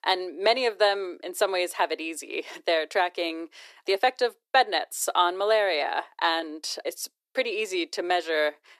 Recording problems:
thin; very; fading below 350 Hz

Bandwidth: 14 kHz